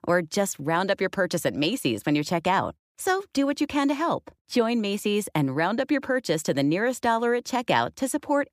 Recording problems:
none

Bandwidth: 15 kHz